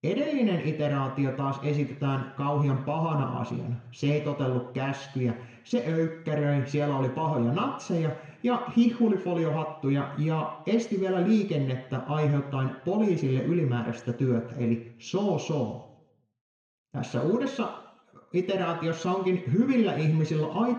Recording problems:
room echo; slight; dies away in 0.8 s
off-mic speech; somewhat distant

